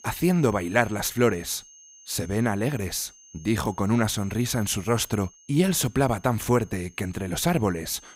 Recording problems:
high-pitched whine; faint; throughout; 6.5 kHz, 25 dB below the speech

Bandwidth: 15.5 kHz